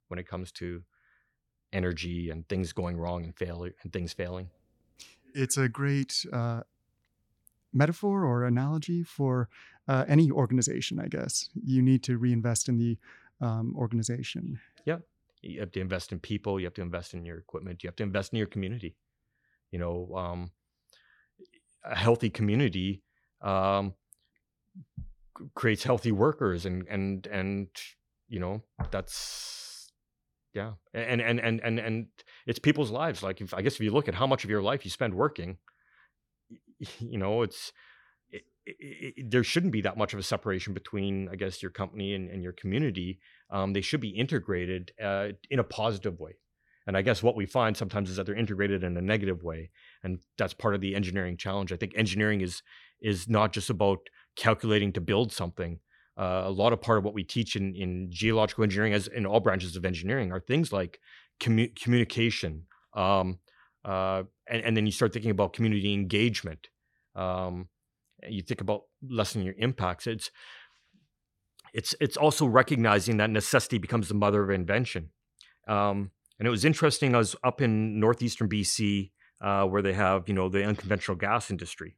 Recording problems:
none

